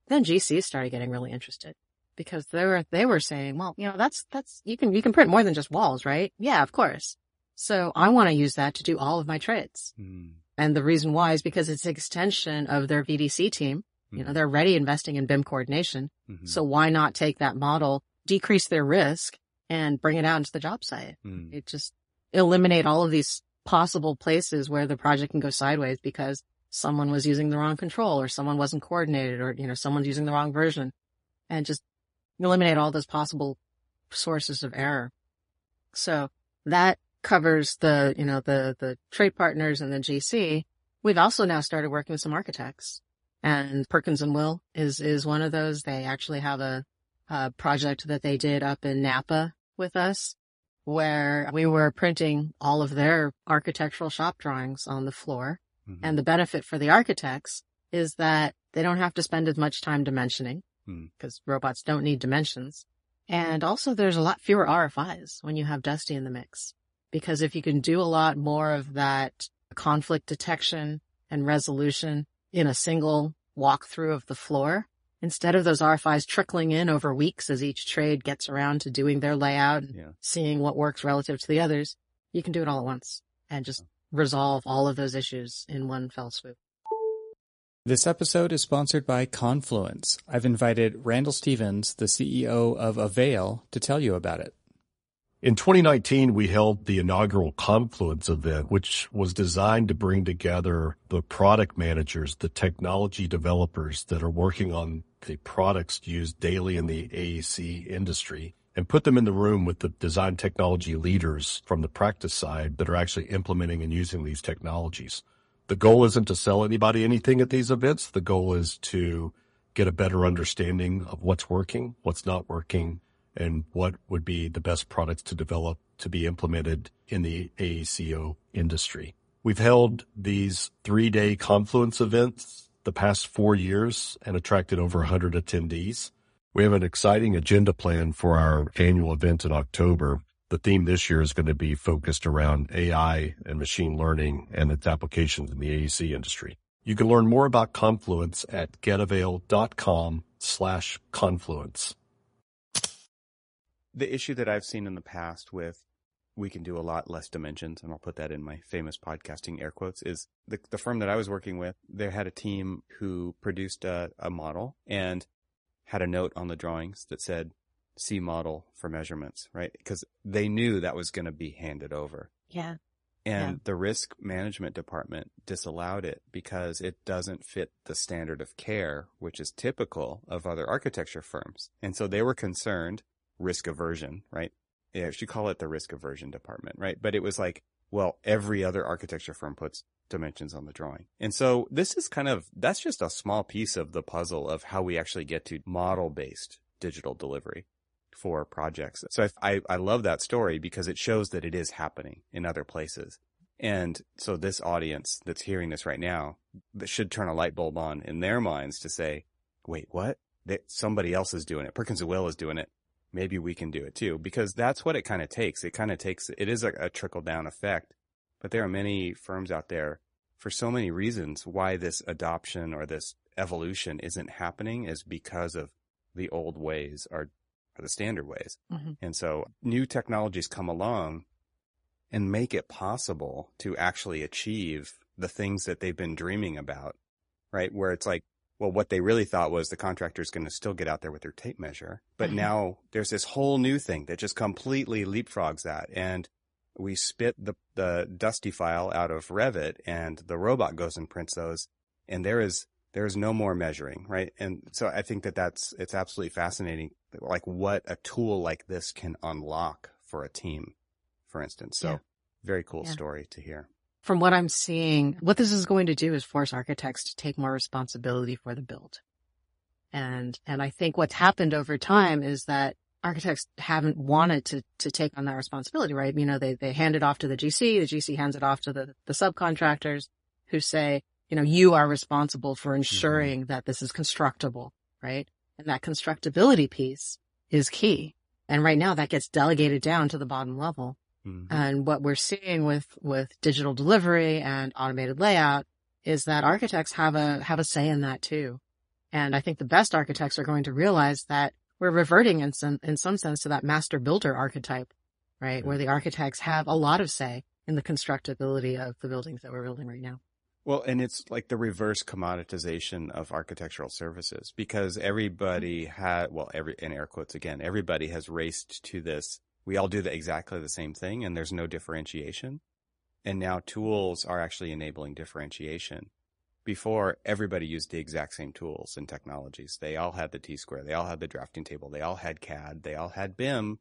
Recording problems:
garbled, watery; slightly; nothing above 10.5 kHz

